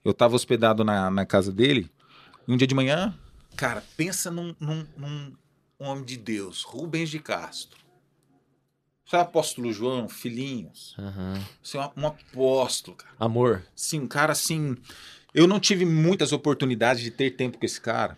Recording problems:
uneven, jittery; strongly; from 2 to 17 s

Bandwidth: 14.5 kHz